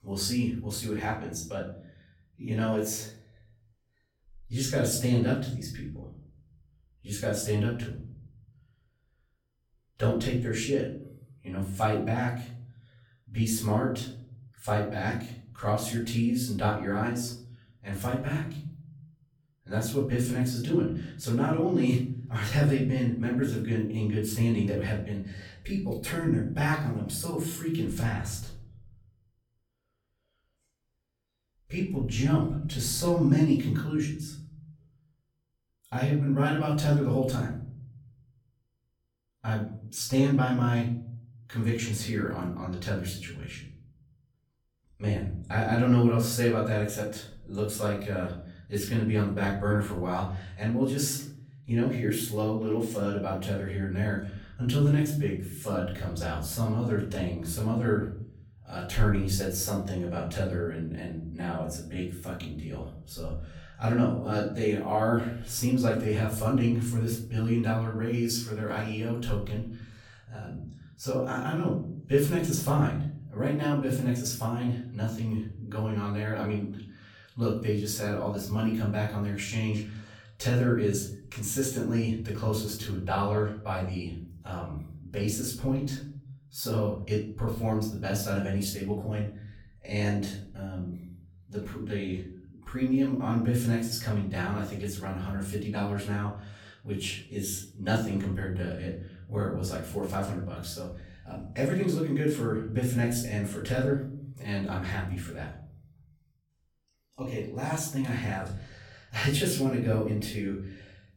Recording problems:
off-mic speech; far
room echo; noticeable; dies away in 0.8 s

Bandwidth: 18 kHz